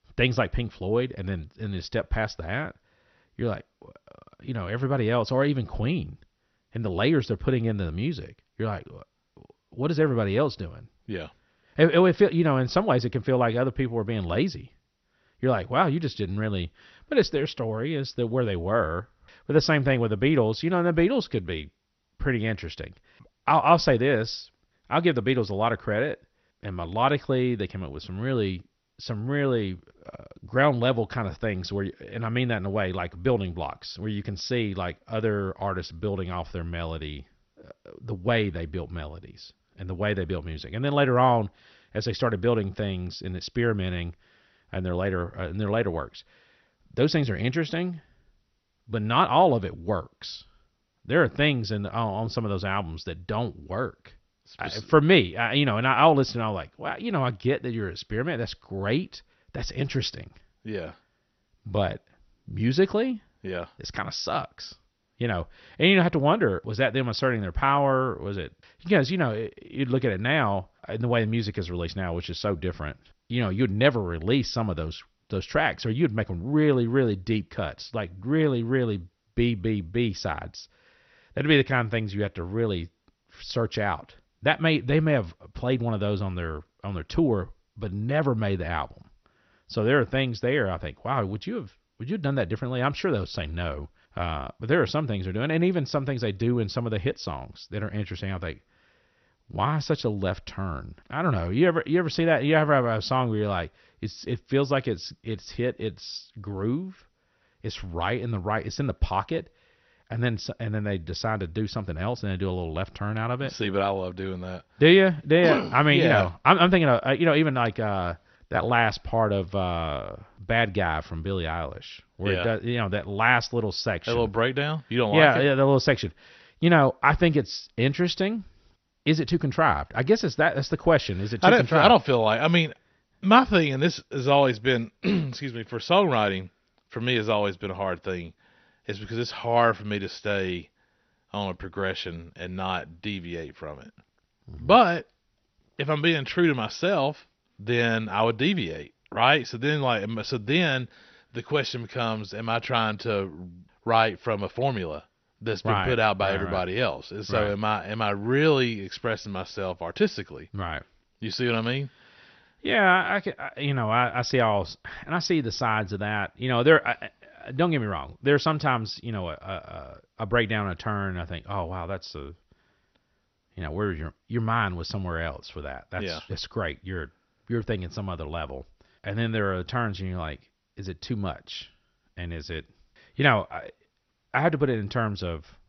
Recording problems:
garbled, watery; slightly; nothing above 6 kHz

